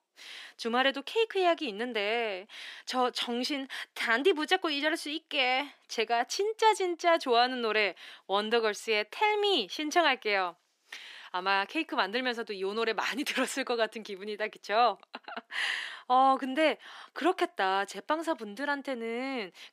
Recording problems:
thin; somewhat; fading below 350 Hz

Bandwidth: 15.5 kHz